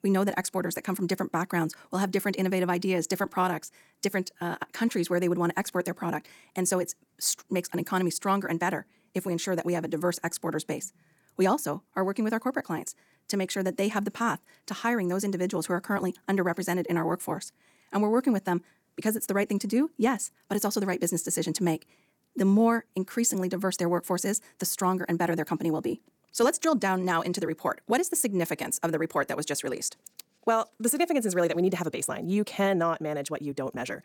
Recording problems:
wrong speed, natural pitch; too fast; 1.5 times normal speed

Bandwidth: 18.5 kHz